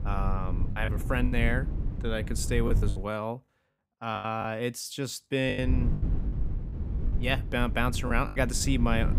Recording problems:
low rumble; noticeable; until 3 s and from 5.5 s on; 15 dB below the speech
choppy; very; 8% of the speech affected

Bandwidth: 15.5 kHz